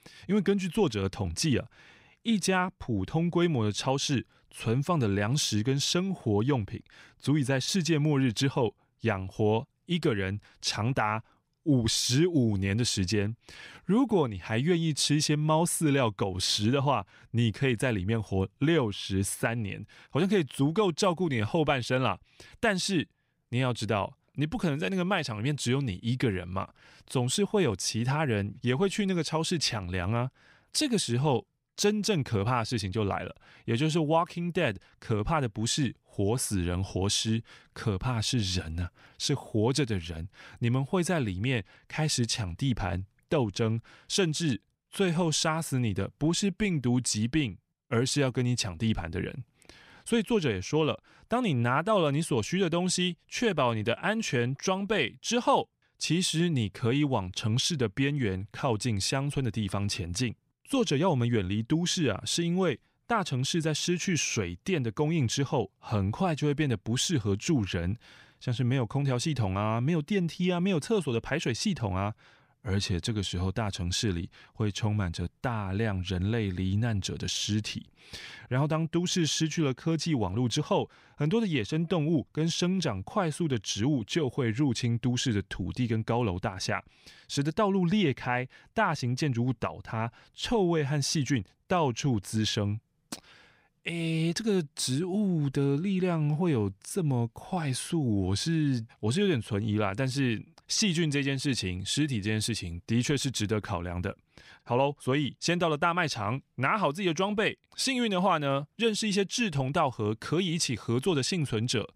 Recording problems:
none

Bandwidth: 15.5 kHz